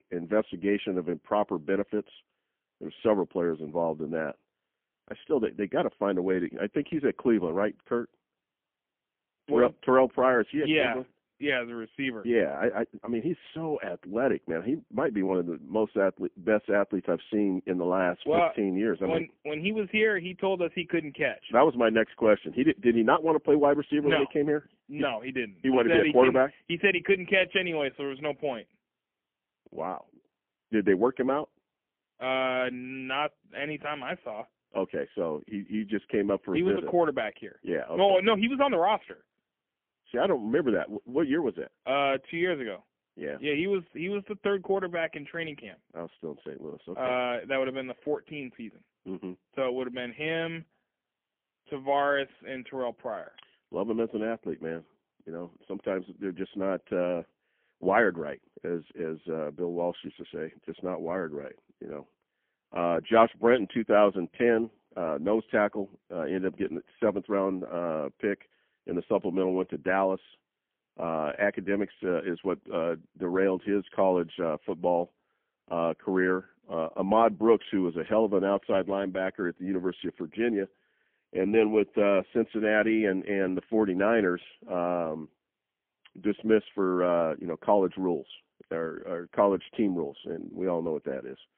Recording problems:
phone-call audio; poor line; nothing above 3.5 kHz

